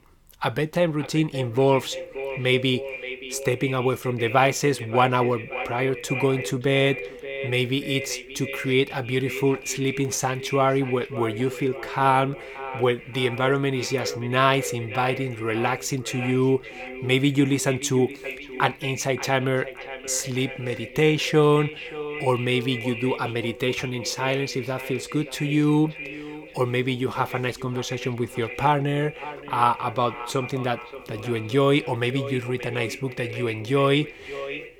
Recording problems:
echo of what is said; strong; throughout; 580 ms later, 10 dB below the speech

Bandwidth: 18.5 kHz